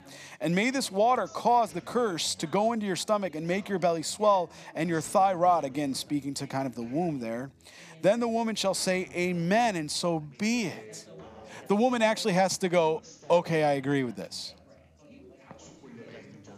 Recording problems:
background chatter; faint; throughout; 4 voices, 25 dB below the speech

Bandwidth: 15 kHz